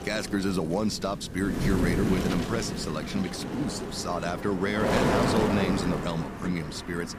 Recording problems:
wind noise on the microphone; heavy; as loud as the speech

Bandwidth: 15 kHz